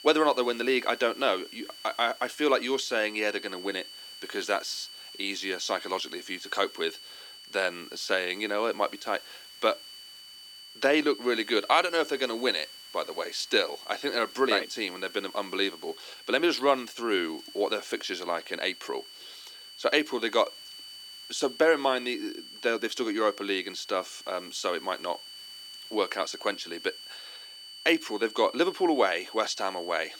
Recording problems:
thin; somewhat; fading below 300 Hz
high-pitched whine; noticeable; throughout; 3 kHz, 15 dB below the speech
hiss; faint; throughout; 25 dB below the speech

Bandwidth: 17.5 kHz